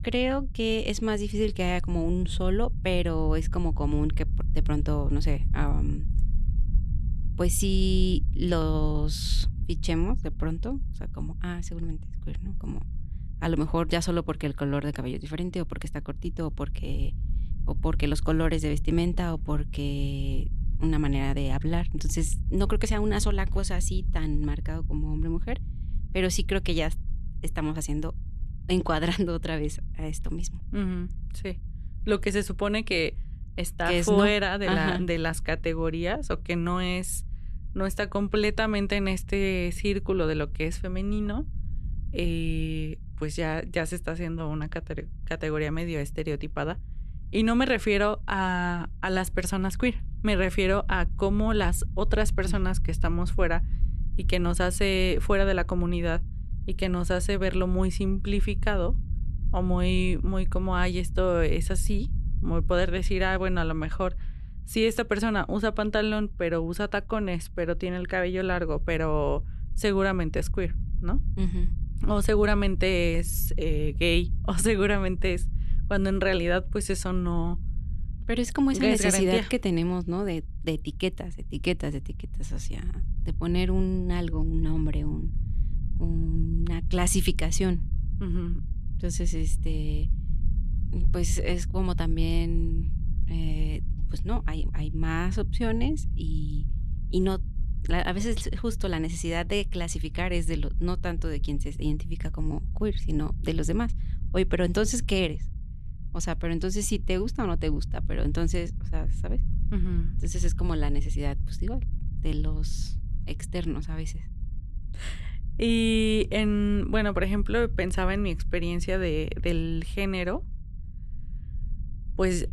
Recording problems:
low rumble; faint; throughout; 20 dB below the speech

